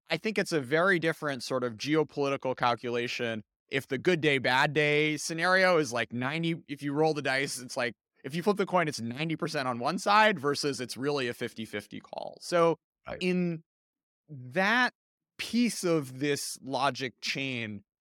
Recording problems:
none

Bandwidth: 17 kHz